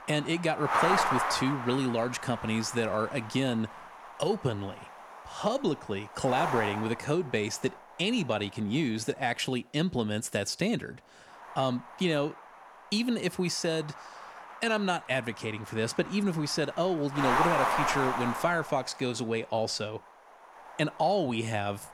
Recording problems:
wind noise on the microphone; heavy; 1 dB above the speech

